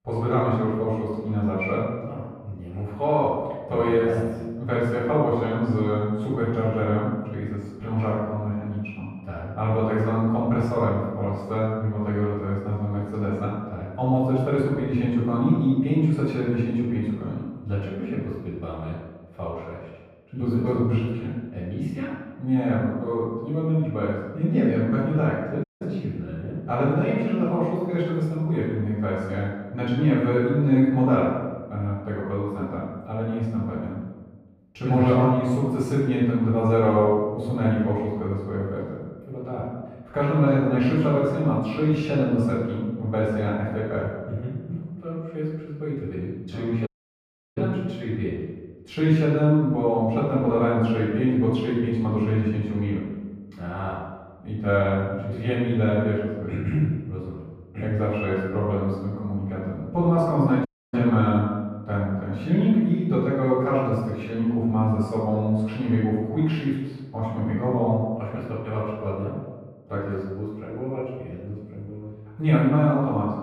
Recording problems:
off-mic speech; far
muffled; very; fading above 3.5 kHz
room echo; noticeable; dies away in 1.1 s
audio cutting out; at 26 s, at 47 s for 0.5 s and at 1:01

